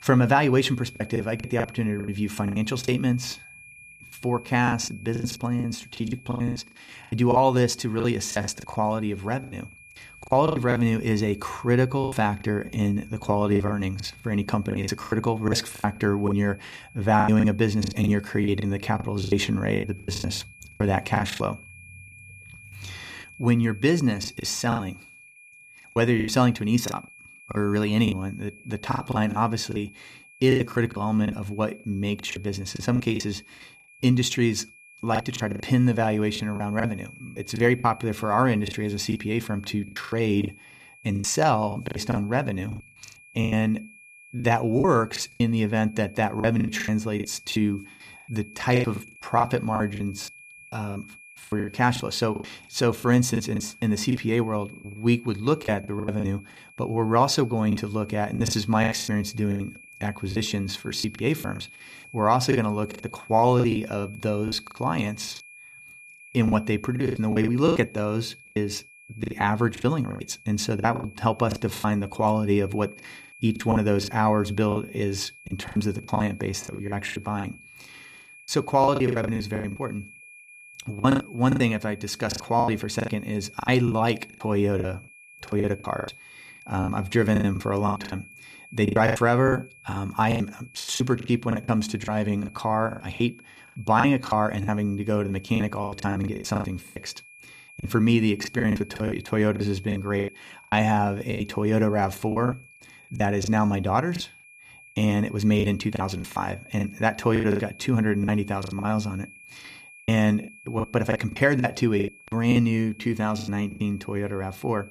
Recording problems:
high-pitched whine; faint; throughout; 2.5 kHz, 20 dB below the speech
choppy; very; 15% of the speech affected

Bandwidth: 14.5 kHz